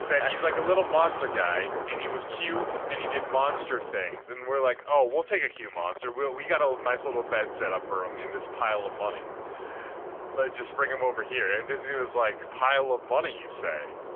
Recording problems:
phone-call audio; poor line; nothing above 3 kHz
traffic noise; loud; throughout; 8 dB below the speech

